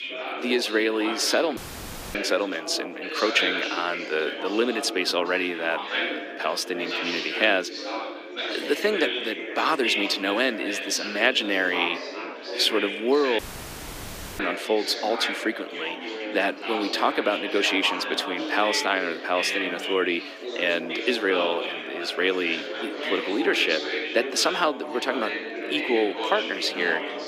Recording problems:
thin; somewhat; fading below 300 Hz
chatter from many people; loud; throughout; 5 dB below the speech
audio cutting out; at 1.5 s for 0.5 s and at 13 s for 1 s

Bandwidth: 15 kHz